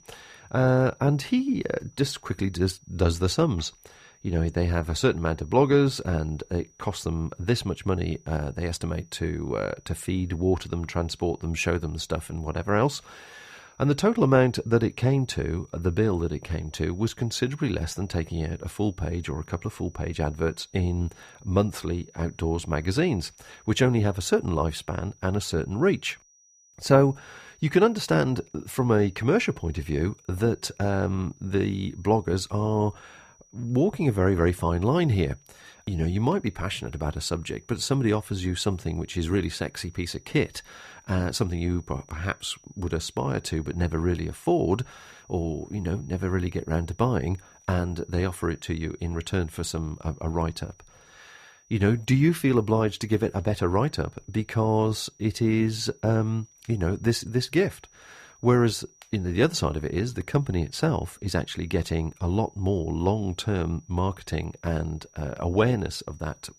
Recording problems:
high-pitched whine; faint; throughout; 6 kHz, 30 dB below the speech

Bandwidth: 15 kHz